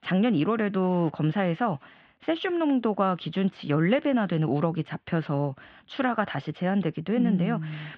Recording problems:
muffled; very; fading above 3.5 kHz

